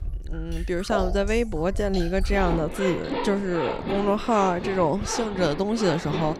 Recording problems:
household noises; loud; throughout; 7 dB below the speech

